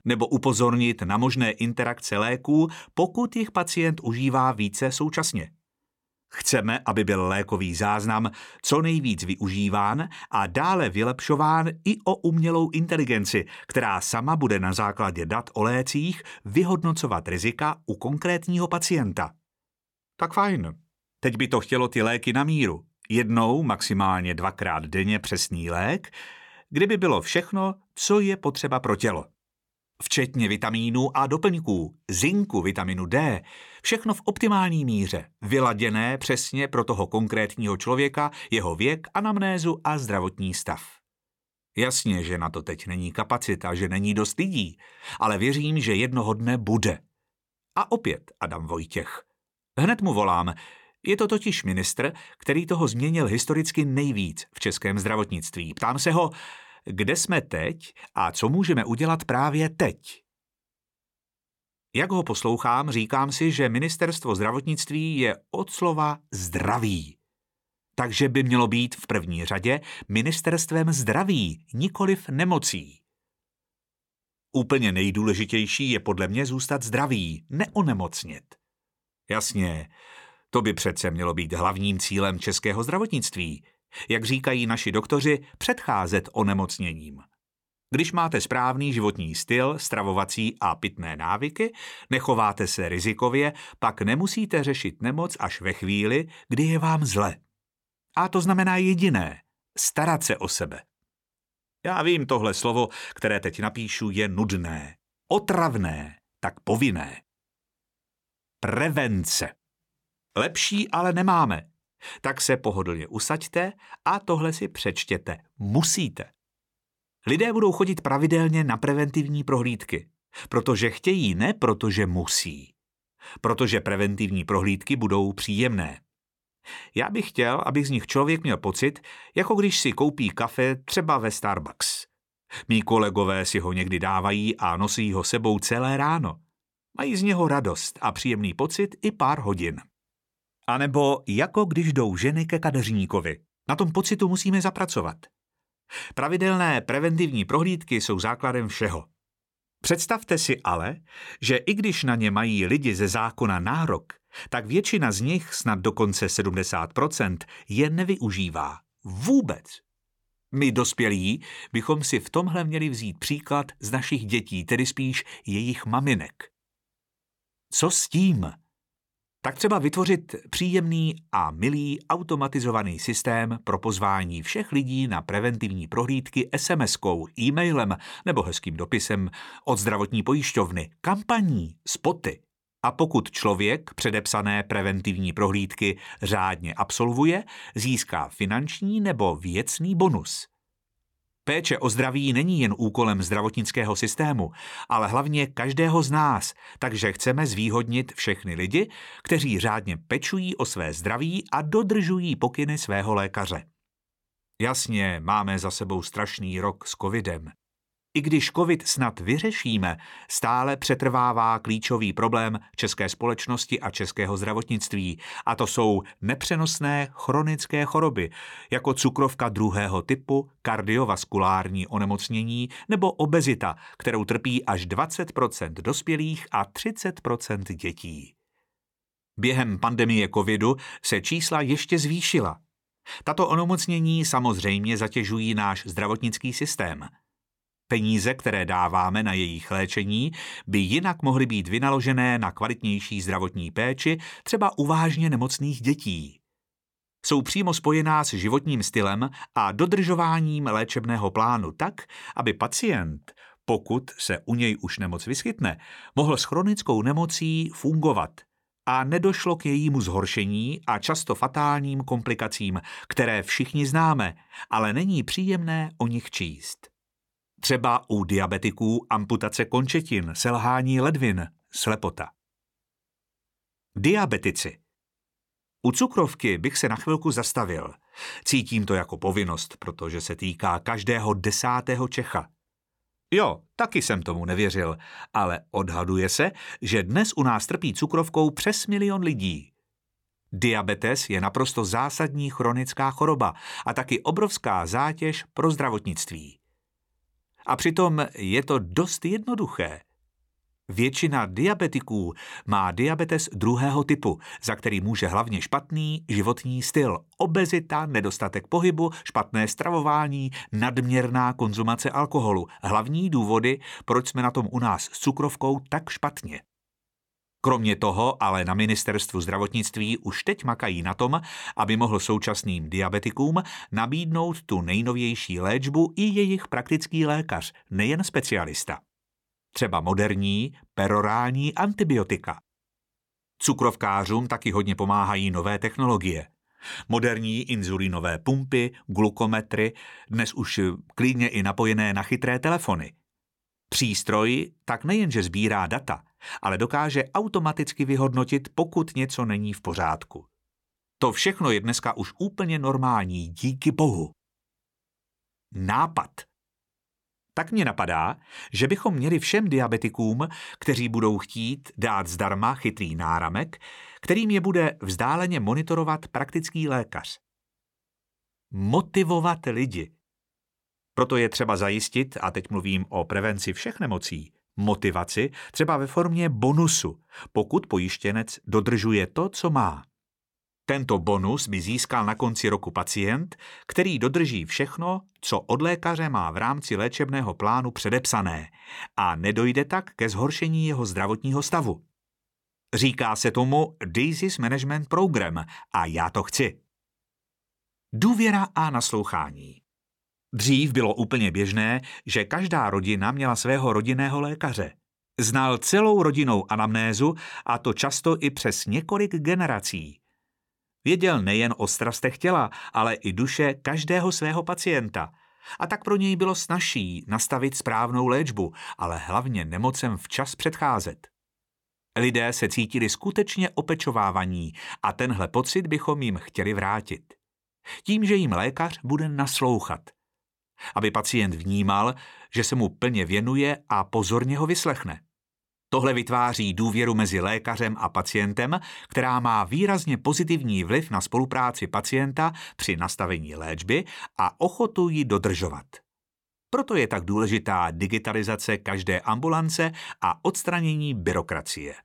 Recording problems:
uneven, jittery; slightly; from 5 s to 7:25

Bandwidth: 17.5 kHz